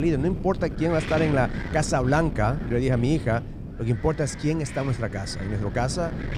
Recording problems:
wind noise on the microphone; occasional gusts; 10 dB below the speech
abrupt cut into speech; at the start

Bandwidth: 15 kHz